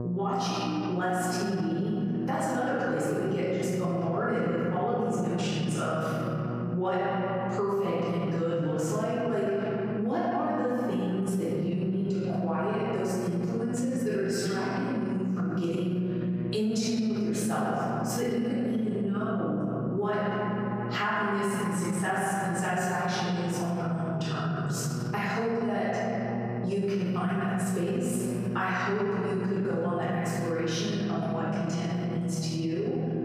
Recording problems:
room echo; strong; dies away in 2.9 s
off-mic speech; far
squashed, flat; somewhat
electrical hum; noticeable; throughout; 60 Hz, 15 dB below the speech

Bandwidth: 14.5 kHz